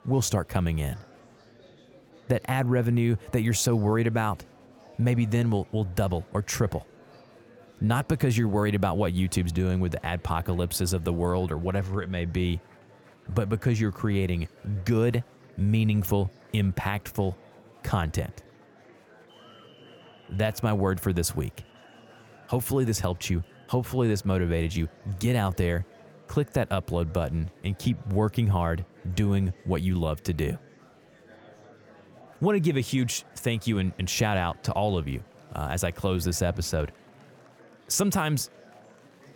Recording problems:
murmuring crowd; faint; throughout; 25 dB below the speech

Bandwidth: 17.5 kHz